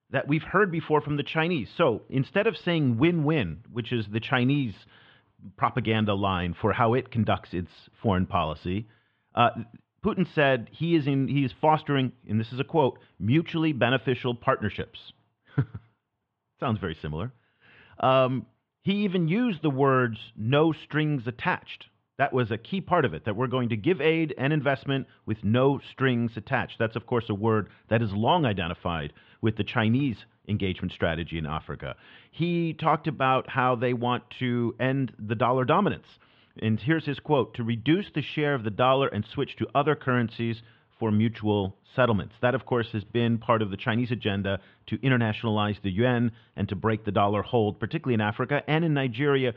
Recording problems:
muffled; very; fading above 3 kHz

